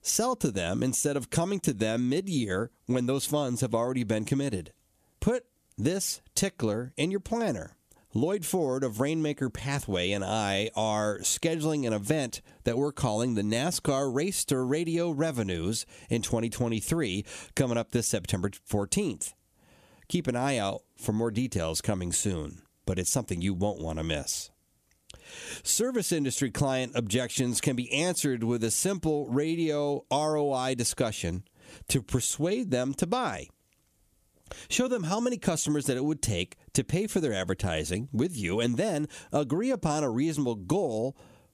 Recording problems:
squashed, flat; somewhat

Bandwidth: 14.5 kHz